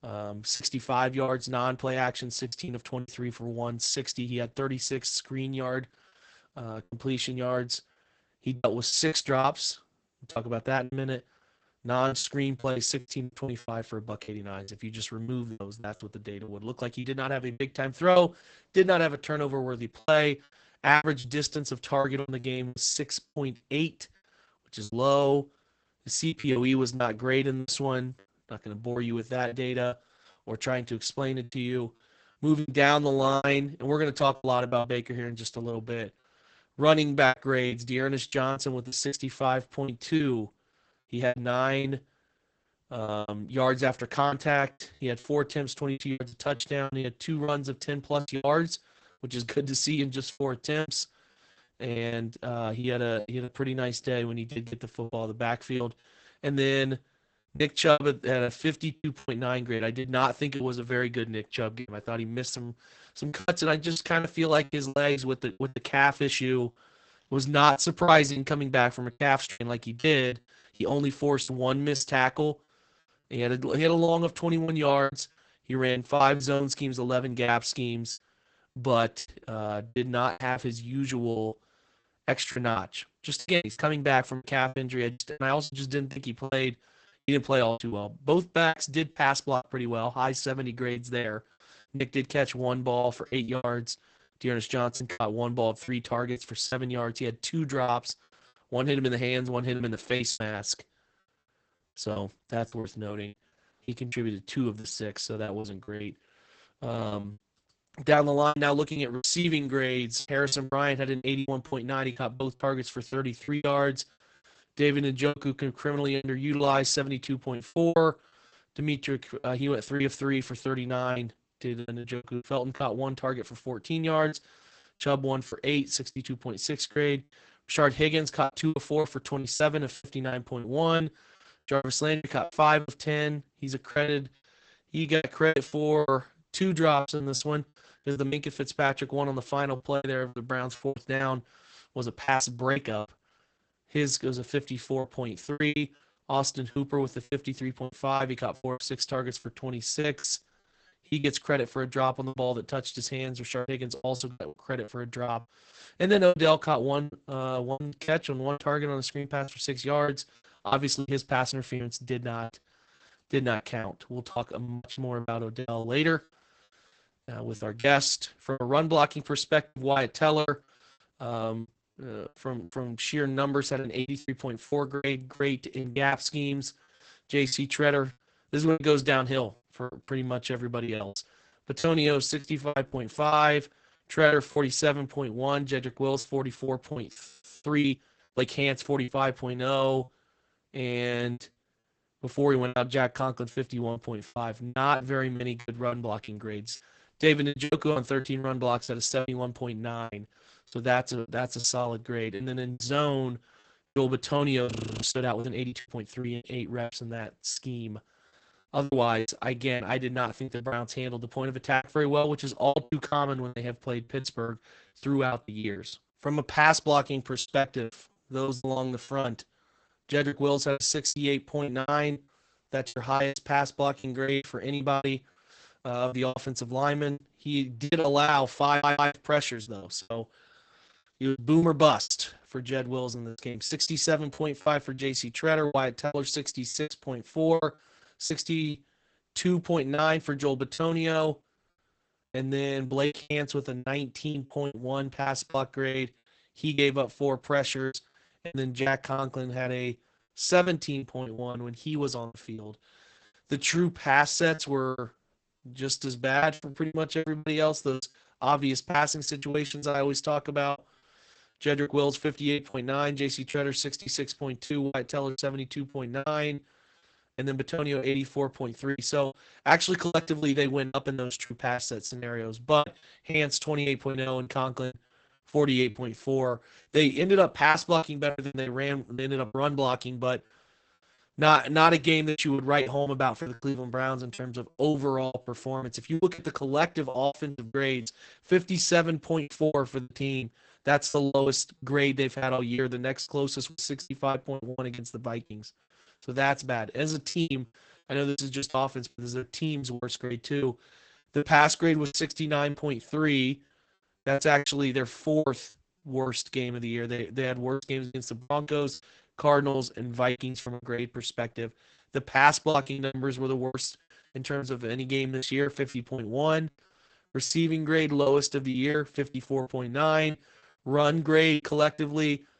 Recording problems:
garbled, watery; badly; nothing above 8 kHz
choppy; very; 13% of the speech affected
audio freezing; at 3:07 and at 3:25
audio stuttering; at 3:49

